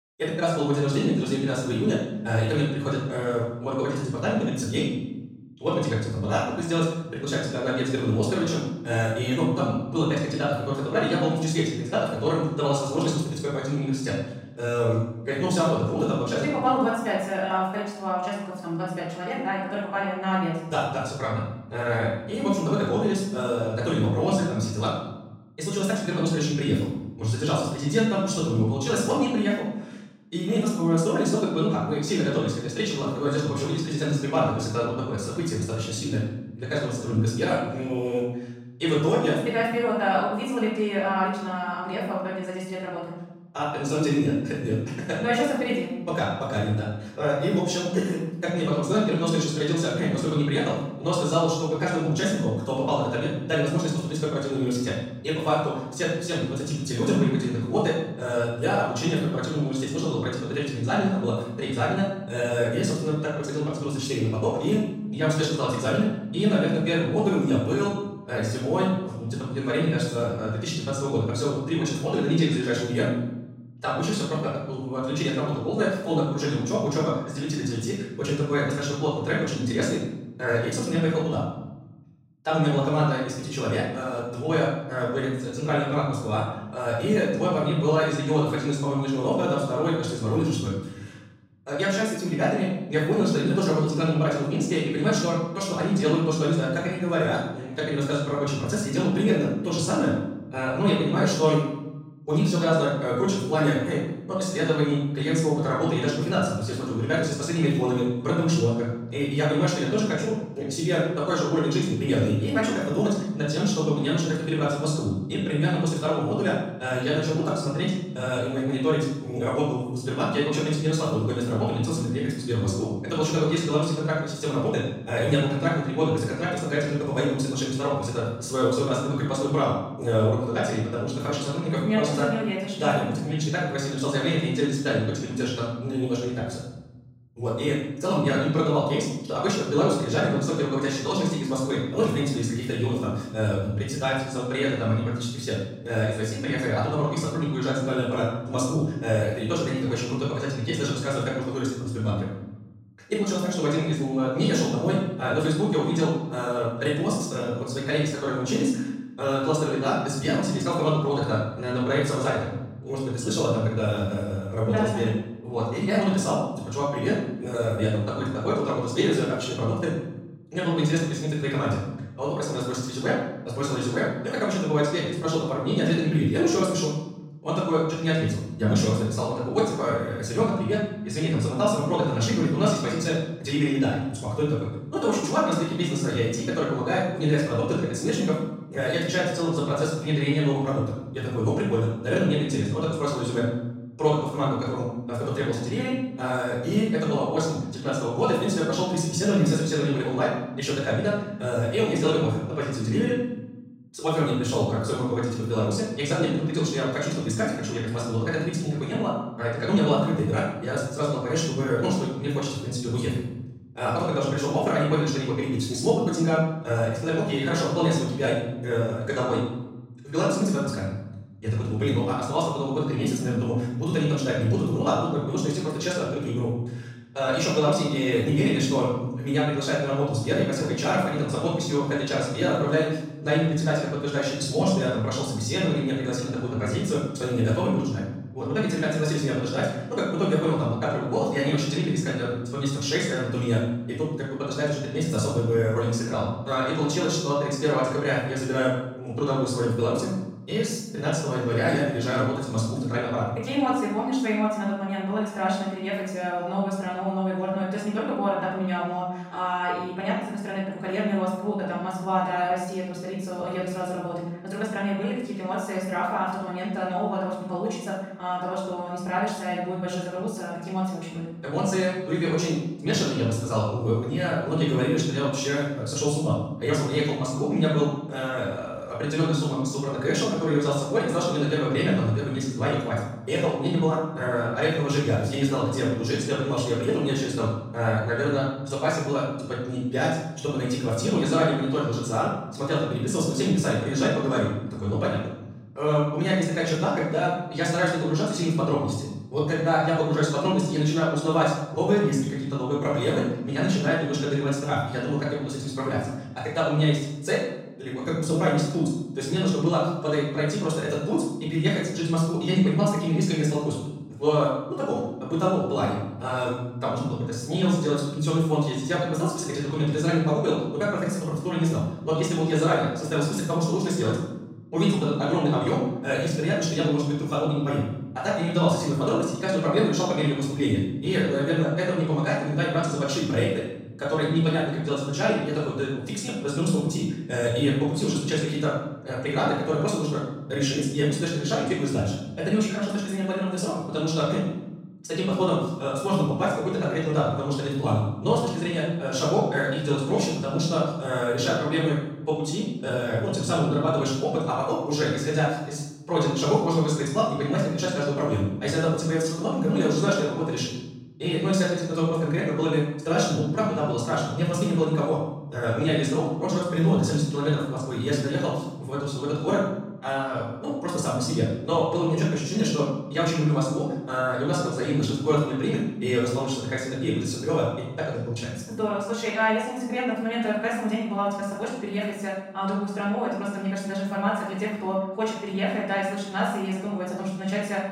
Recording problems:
off-mic speech; far
wrong speed, natural pitch; too fast; 1.6 times normal speed
room echo; noticeable; dies away in 0.9 s

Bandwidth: 16 kHz